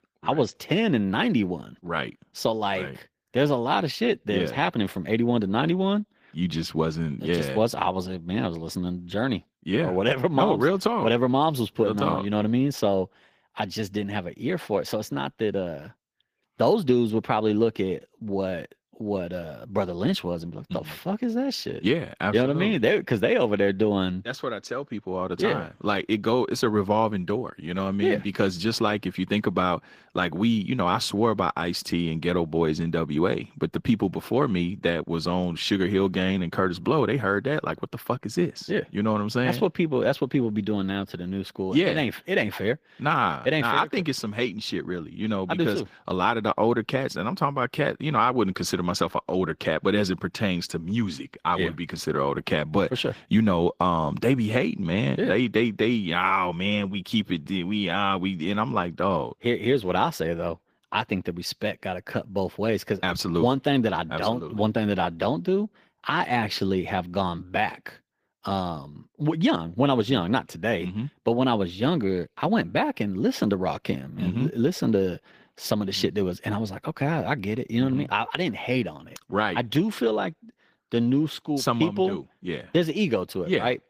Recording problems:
garbled, watery; slightly; nothing above 15 kHz

